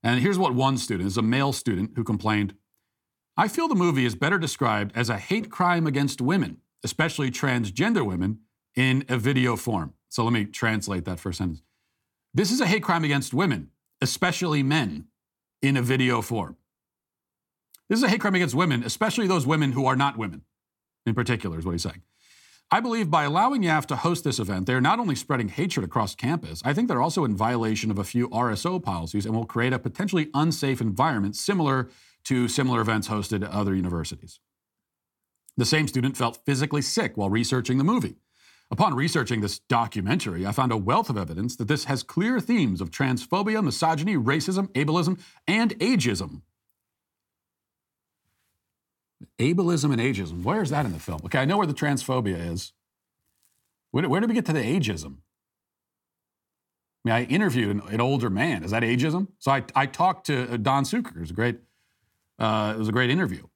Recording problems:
none

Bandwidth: 17.5 kHz